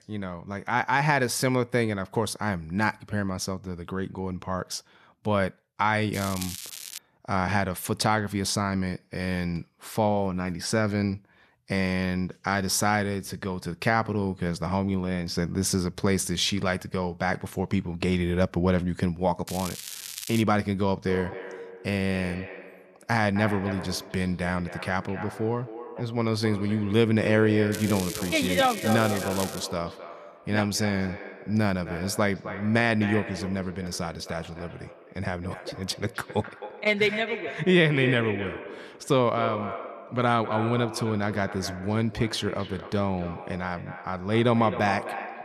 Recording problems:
echo of what is said; strong; from 21 s on; 260 ms later, 10 dB below the speech
crackling; loud; at 6 s, at 19 s and from 28 to 30 s; 10 dB below the speech

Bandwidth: 13.5 kHz